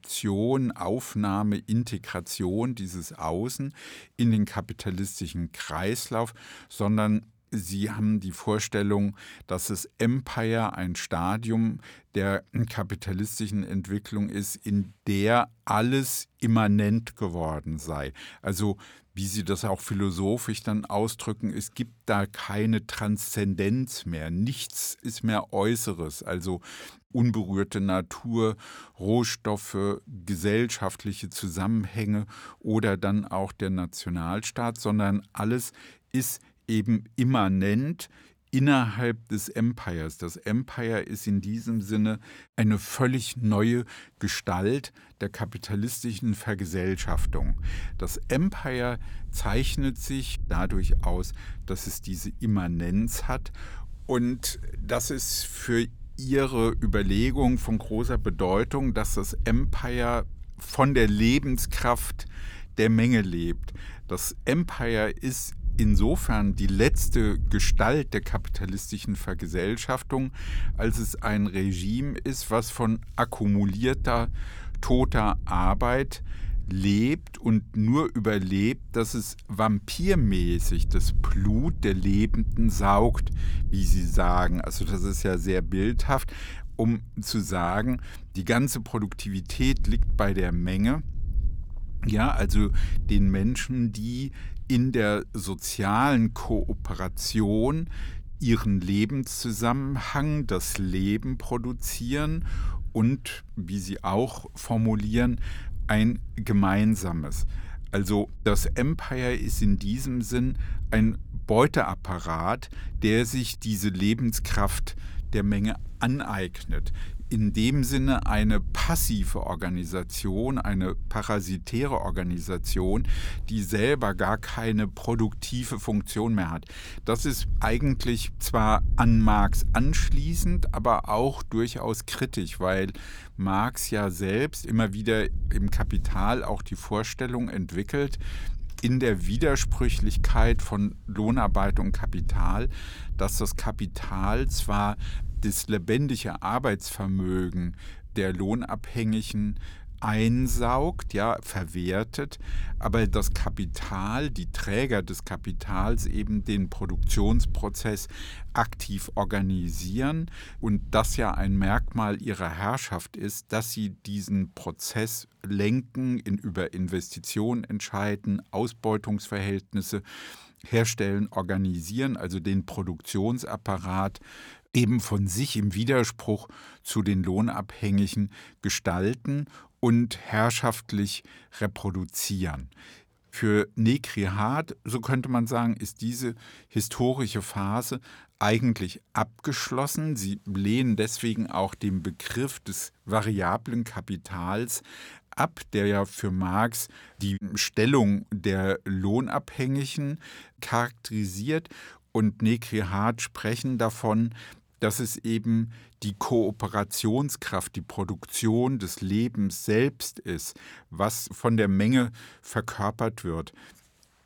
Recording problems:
wind noise on the microphone; occasional gusts; from 47 s to 2:42; 25 dB below the speech

